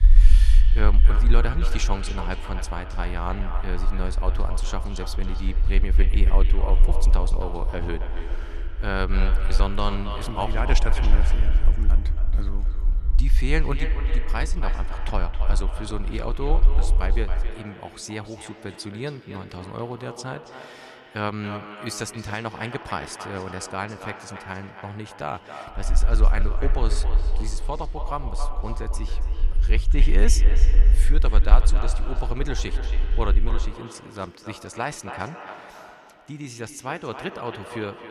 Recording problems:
echo of what is said; strong; throughout; 270 ms later, 7 dB below the speech
low rumble; noticeable; until 17 s and from 26 to 34 s; 15 dB below the speech

